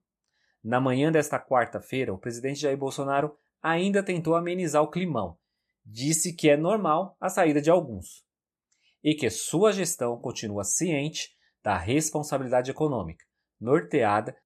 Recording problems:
none

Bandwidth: 14 kHz